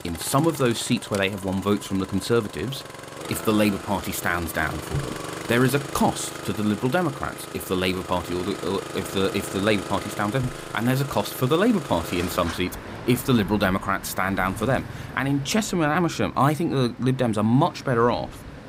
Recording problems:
traffic noise; noticeable; throughout; 10 dB below the speech

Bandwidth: 15.5 kHz